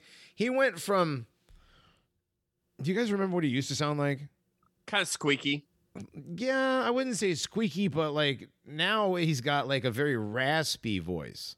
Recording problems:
none

